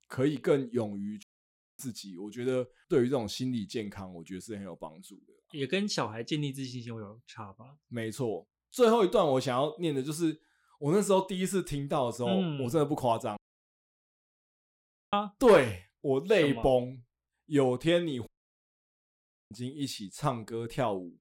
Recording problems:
audio cutting out; at 1 s for 0.5 s, at 13 s for 2 s and at 18 s for 1 s

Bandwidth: 16 kHz